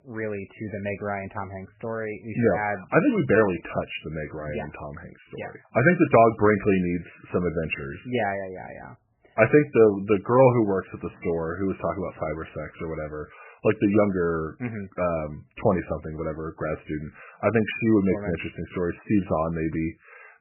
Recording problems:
garbled, watery; badly; nothing above 2.5 kHz

